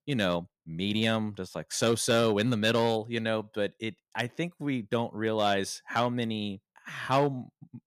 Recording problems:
none

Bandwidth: 14.5 kHz